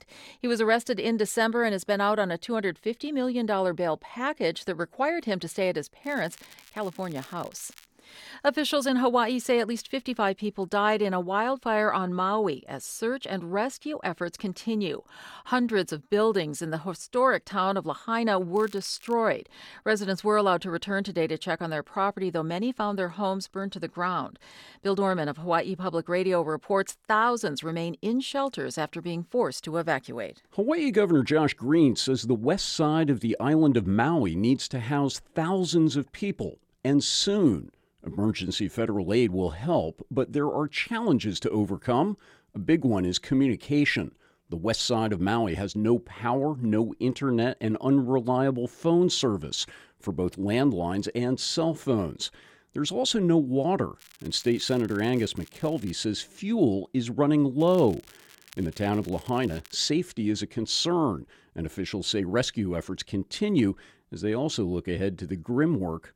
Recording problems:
crackling; faint; 4 times, first at 6 s; 25 dB below the speech

